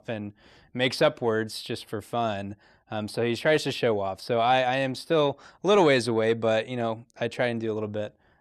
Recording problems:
none

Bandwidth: 15 kHz